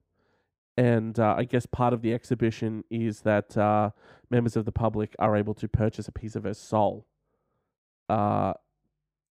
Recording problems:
muffled; slightly; fading above 2 kHz

